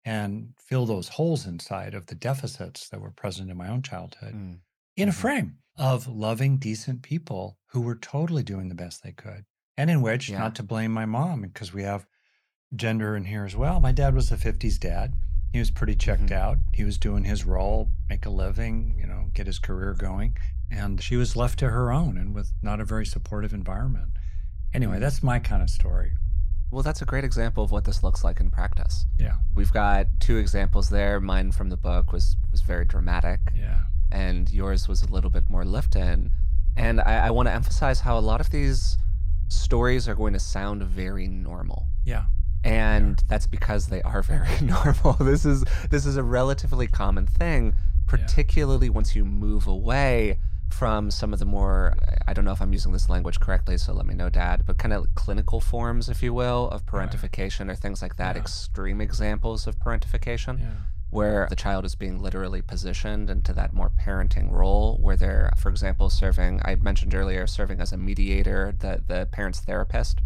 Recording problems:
low rumble; noticeable; from 14 s on; 20 dB below the speech

